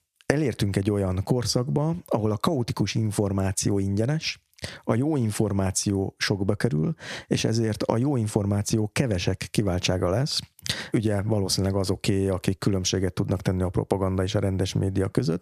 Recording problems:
squashed, flat; somewhat

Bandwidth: 14.5 kHz